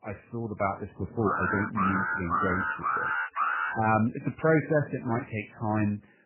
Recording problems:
garbled, watery; badly; nothing above 2.5 kHz
alarm; loud; from 1 to 4 s; peak 1 dB above the speech

